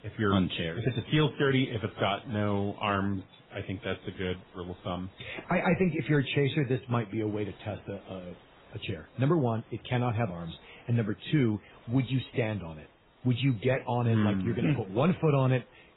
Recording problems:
garbled, watery; badly; nothing above 4 kHz
hiss; faint; throughout; 30 dB below the speech

